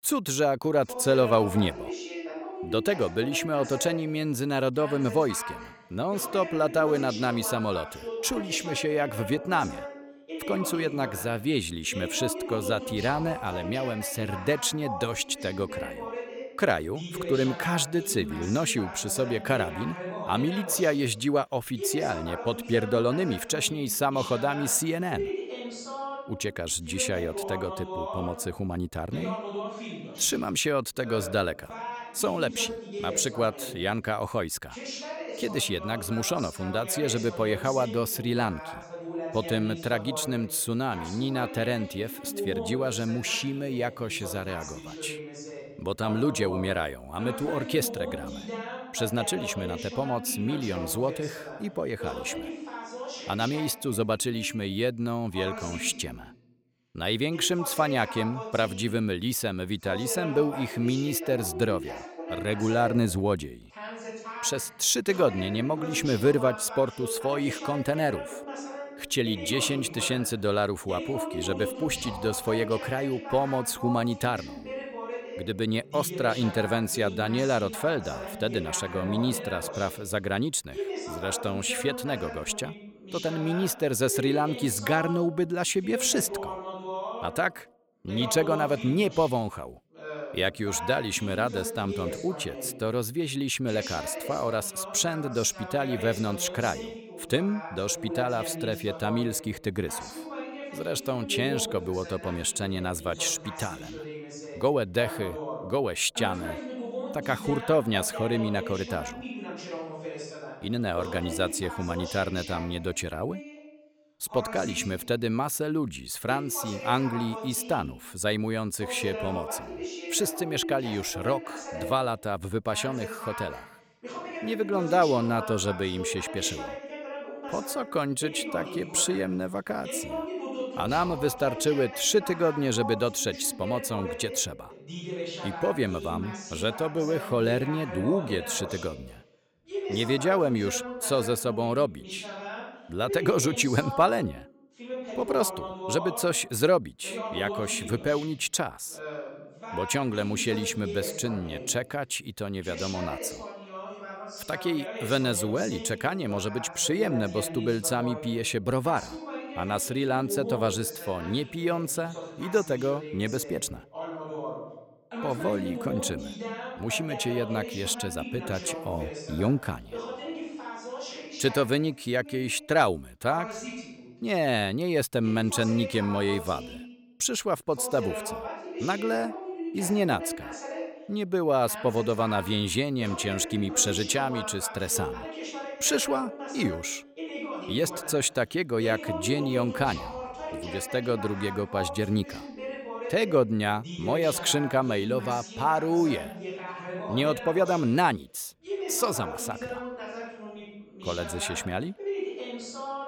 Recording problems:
voice in the background; loud; throughout; 9 dB below the speech

